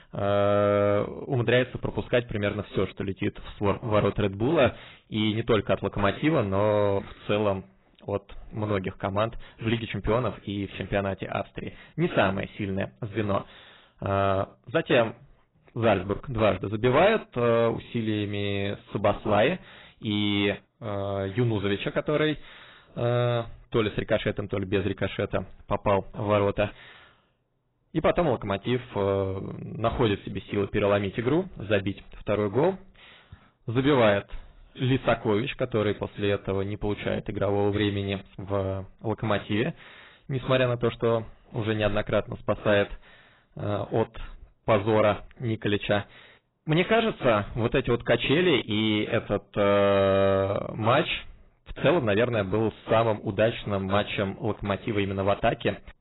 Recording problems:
garbled, watery; badly; nothing above 4 kHz
distortion; slight; 4% of the sound clipped

